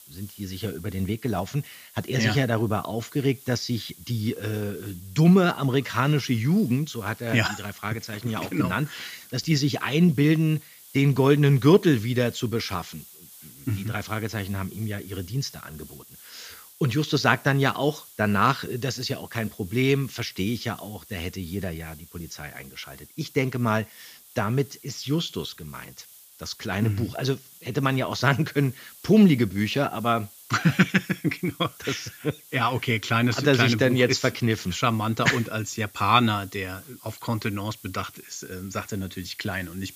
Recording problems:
high frequencies cut off; noticeable; nothing above 8 kHz
hiss; faint; throughout; 20 dB below the speech

